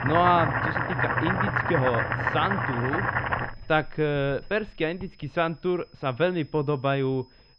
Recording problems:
muffled; very; fading above 3 kHz
household noises; very loud; throughout; 1 dB above the speech
high-pitched whine; faint; throughout; 5 kHz, 30 dB below the speech

